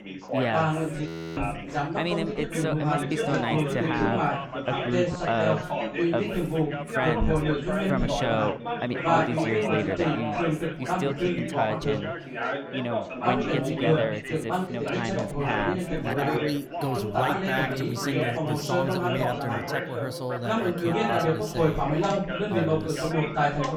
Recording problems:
chatter from many people; very loud; throughout; 4 dB above the speech
audio freezing; at 1 s

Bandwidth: 18 kHz